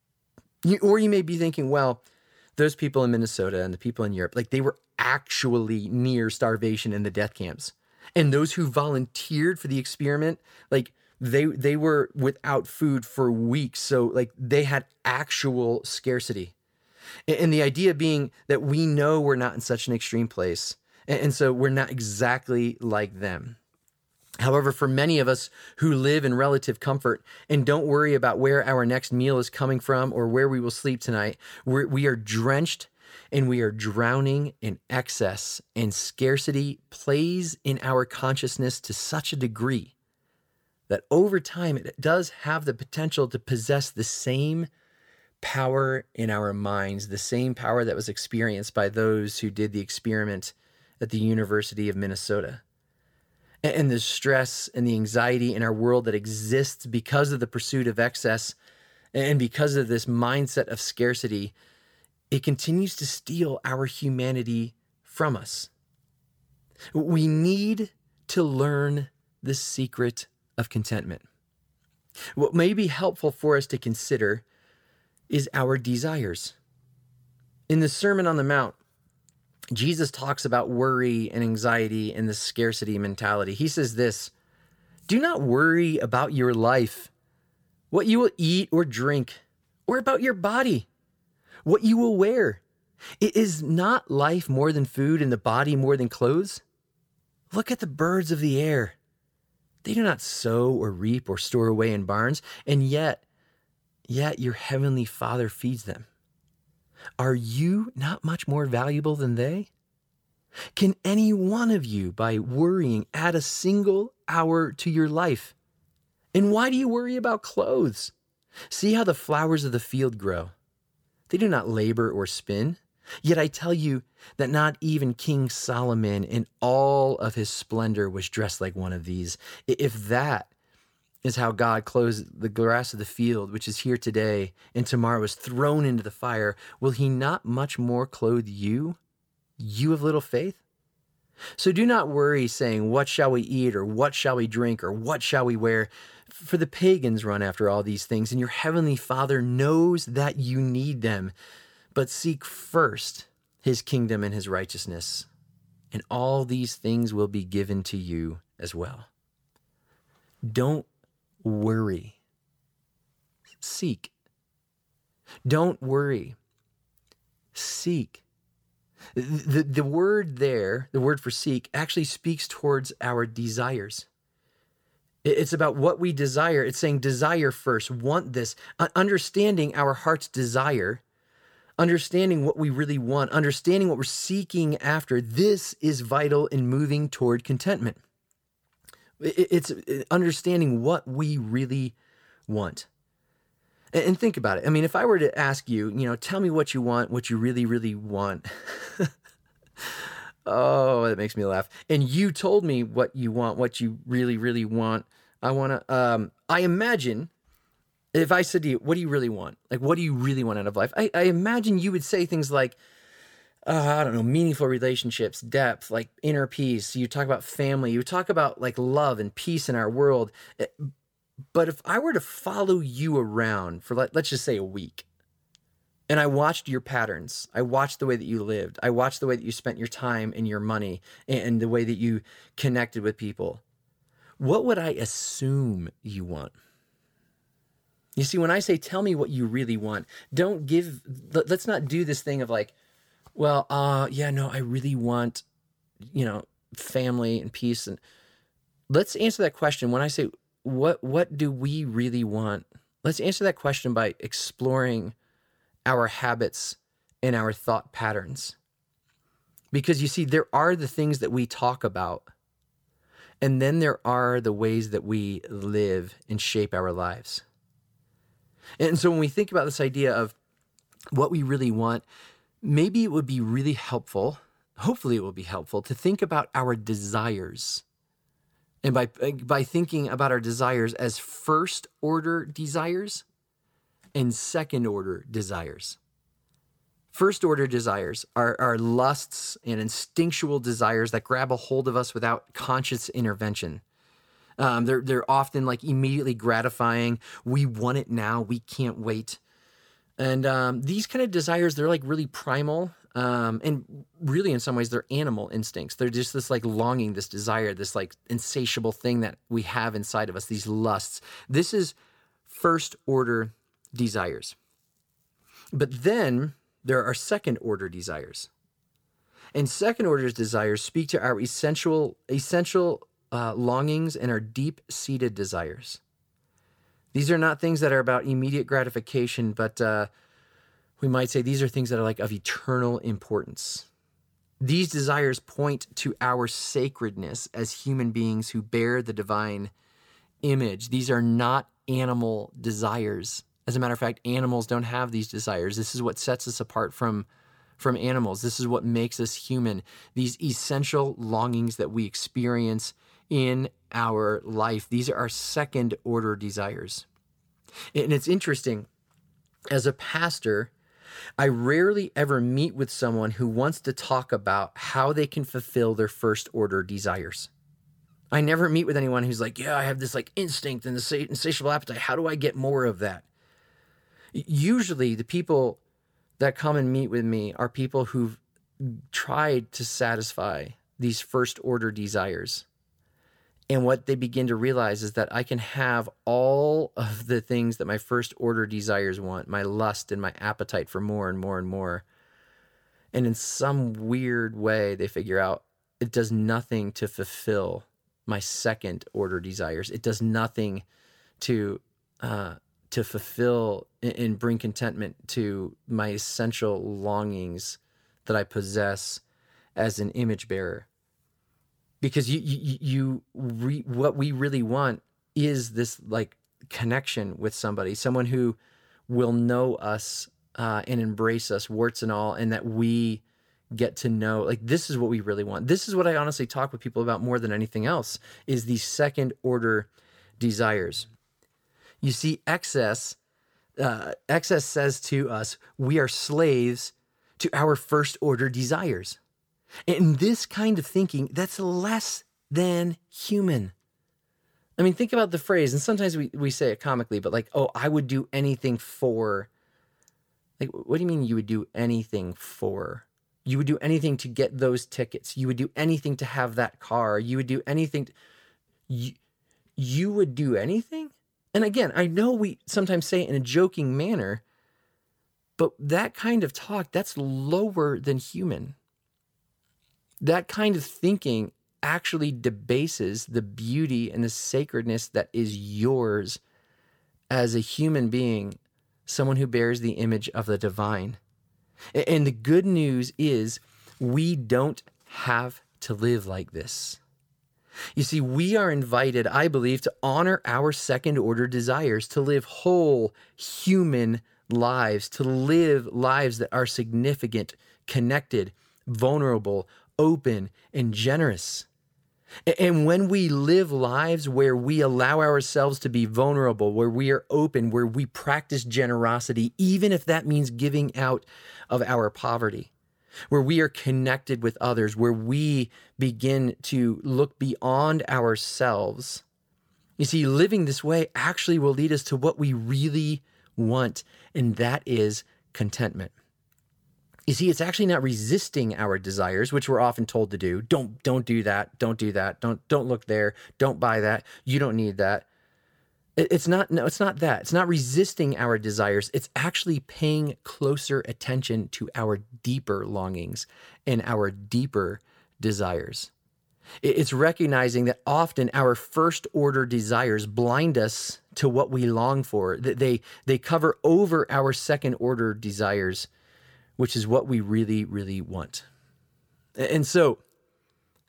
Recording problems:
none

